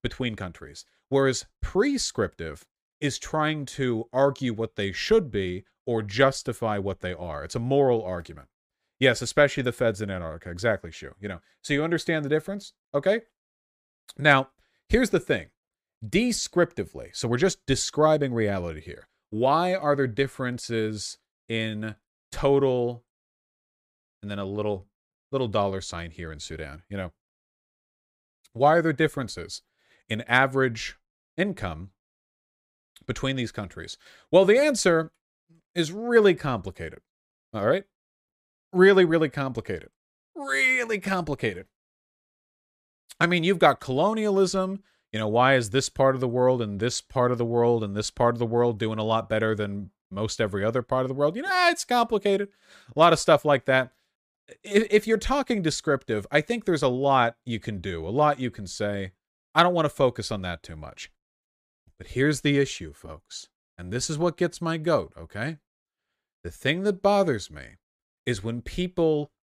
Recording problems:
none

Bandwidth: 15 kHz